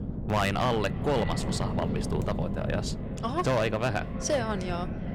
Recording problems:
echo of what is said; noticeable; throughout; 330 ms later, 15 dB below the speech
distortion; slight; 4% of the sound clipped
wind noise on the microphone; occasional gusts; 10 dB below the speech

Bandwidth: 18.5 kHz